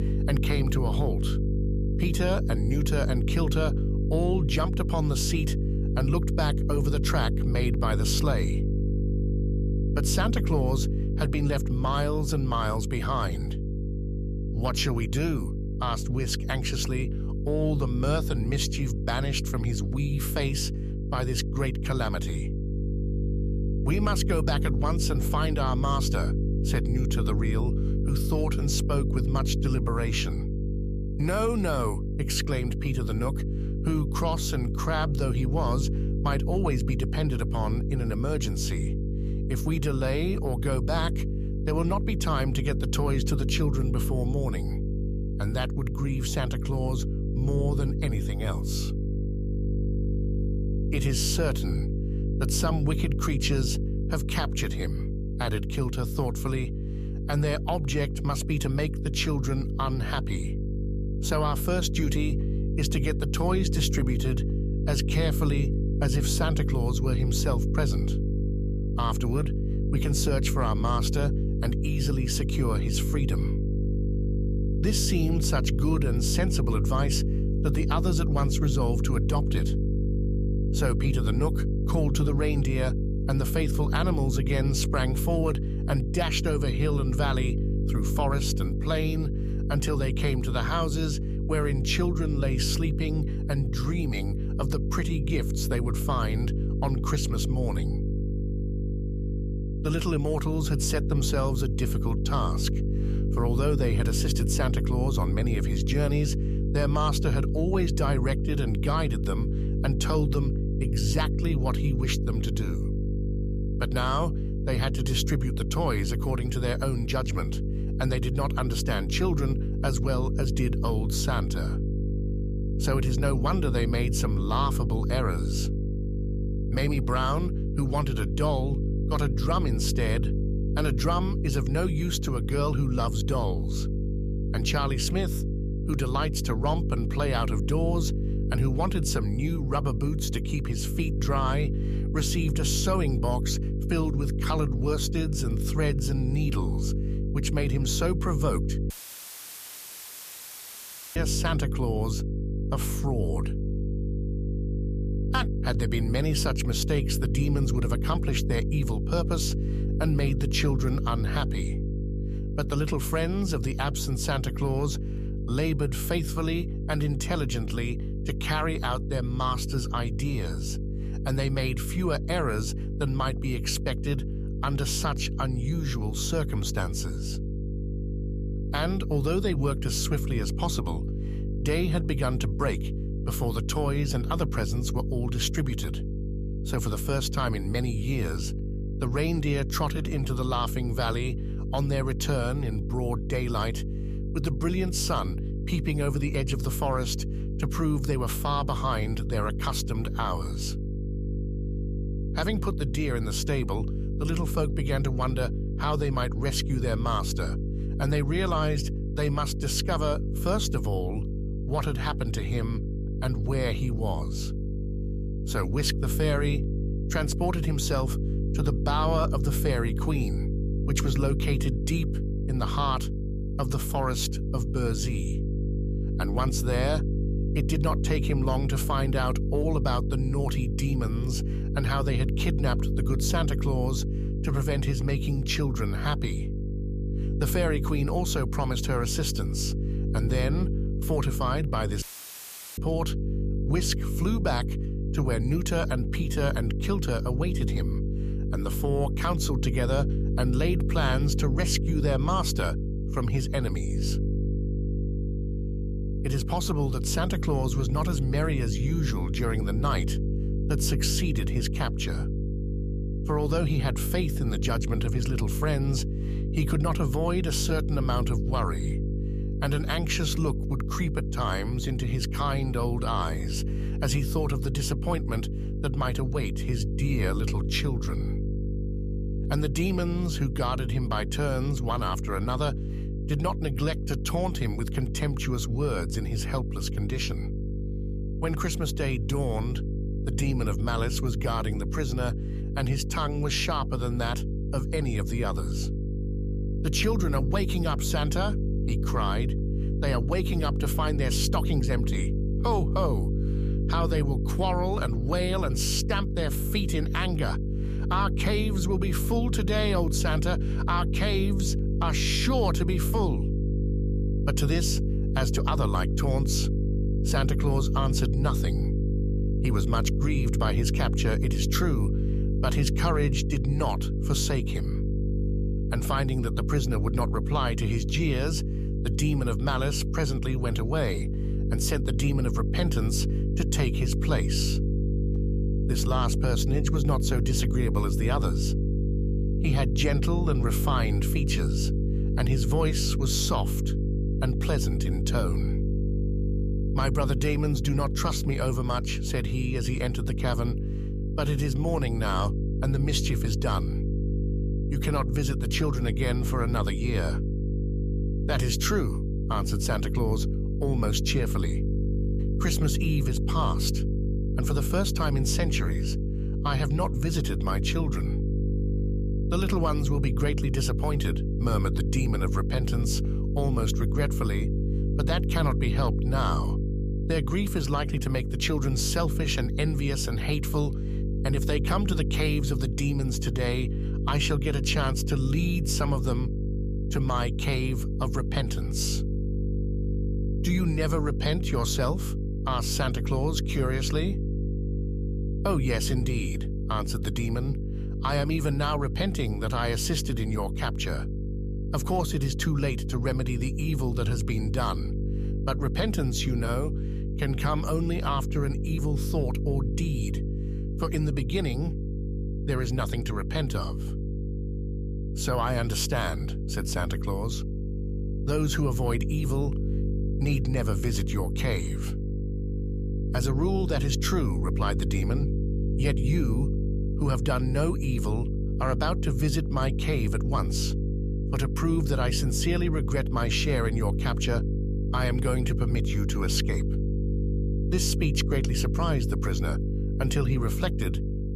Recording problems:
electrical hum; loud; throughout; 50 Hz, 8 dB below the speech
audio cutting out; filled with static; at 2:29 for 2.5 s and at 4:02 for 1 s

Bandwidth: 14.5 kHz